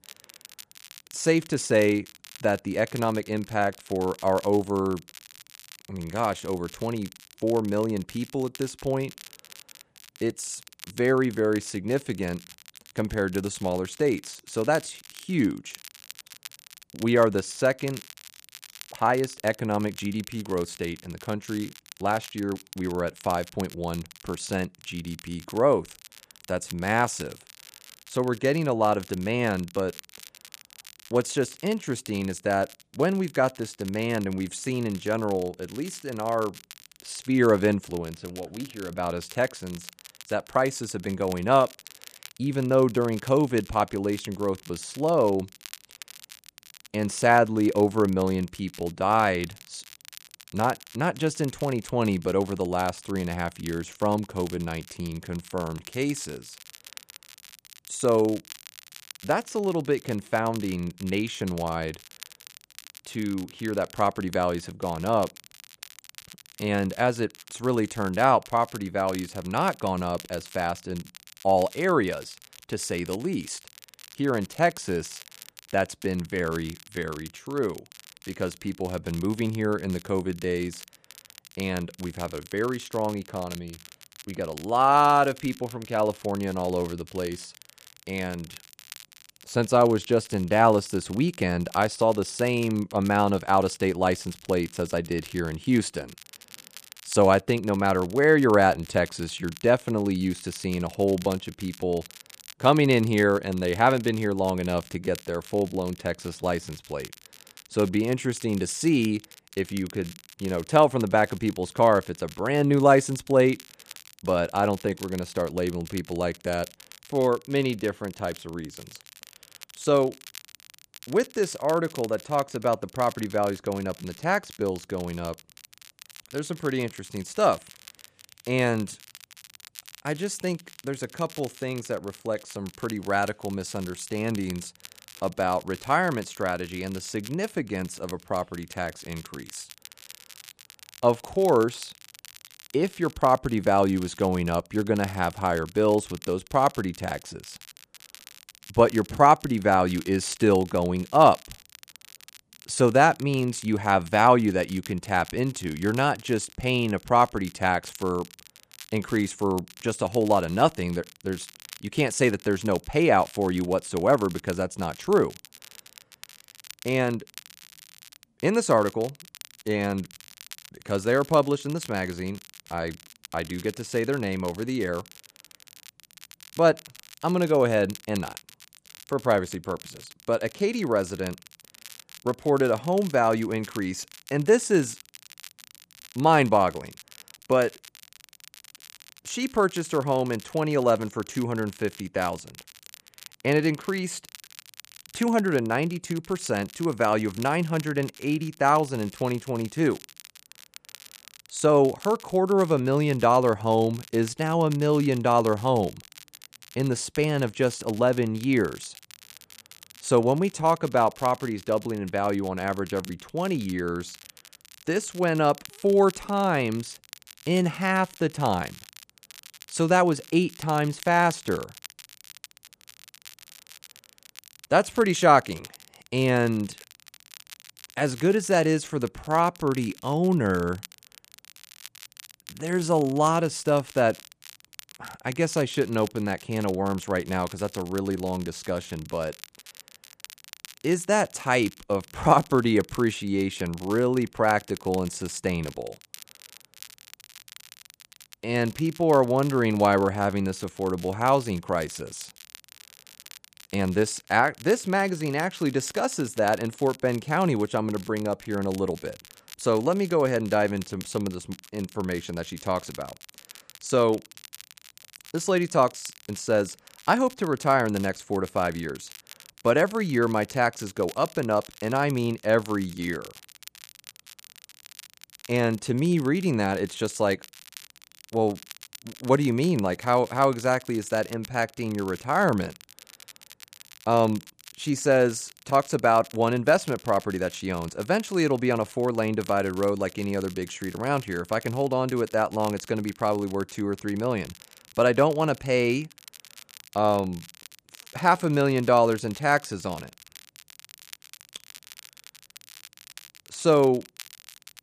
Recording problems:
crackle, like an old record; faint; 20 dB below the speech

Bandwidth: 14.5 kHz